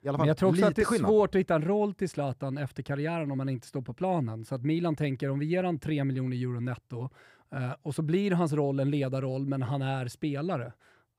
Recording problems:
none

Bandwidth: 15.5 kHz